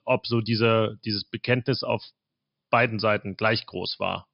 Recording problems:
high frequencies cut off; noticeable; nothing above 5.5 kHz

